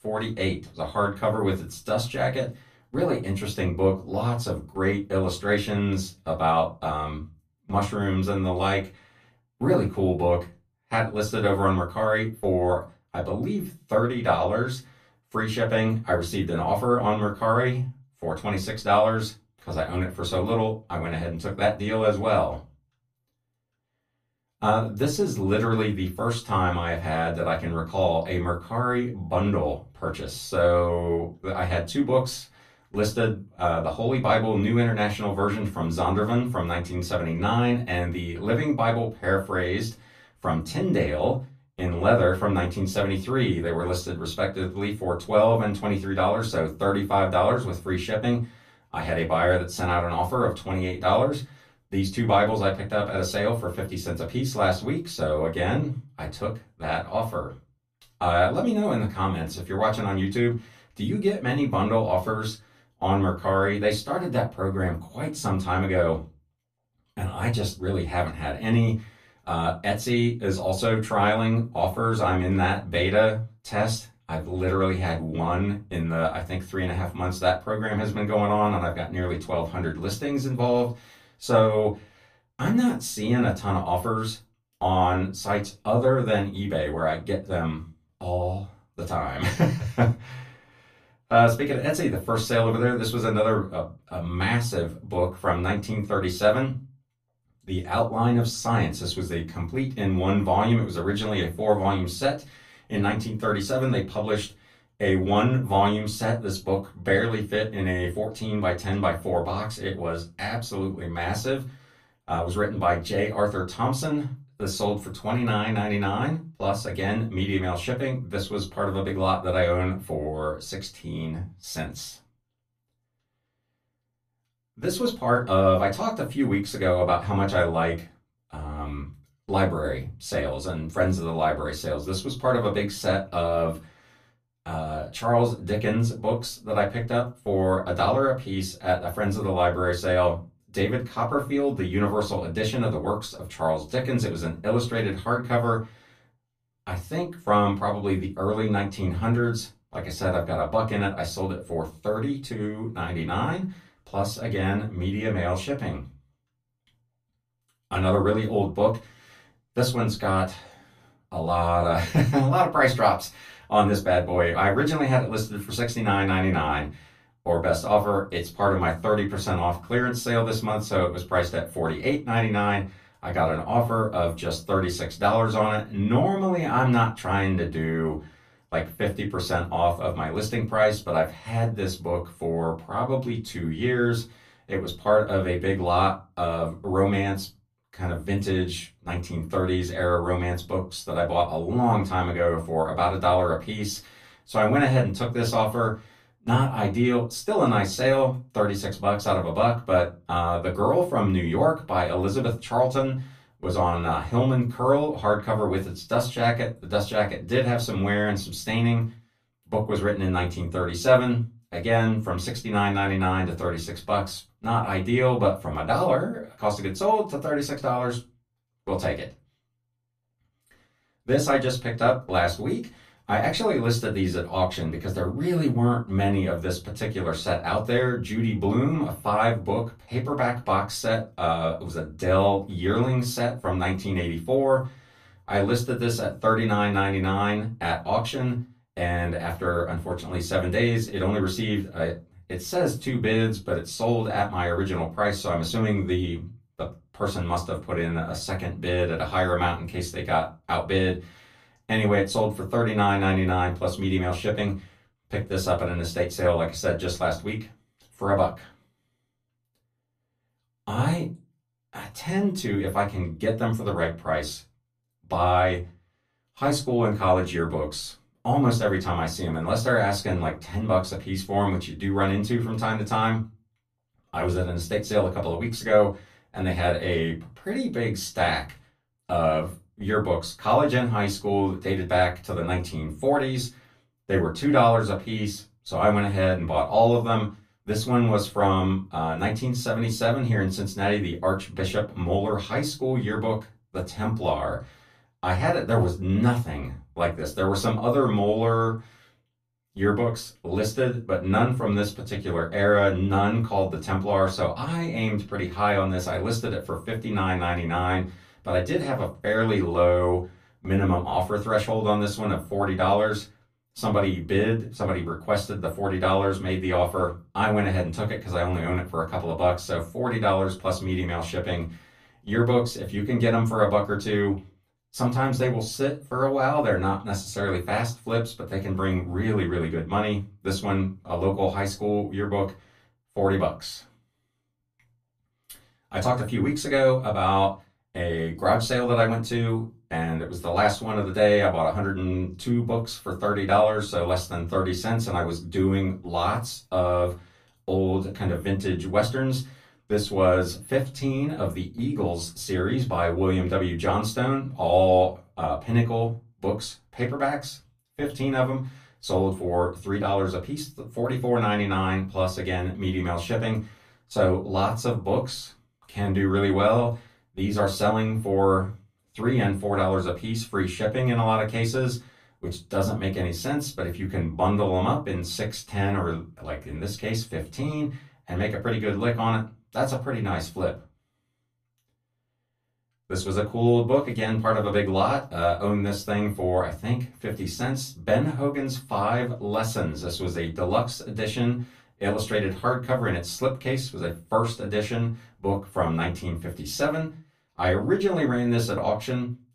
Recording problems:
off-mic speech; far
room echo; very slight; dies away in 0.2 s

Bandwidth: 14.5 kHz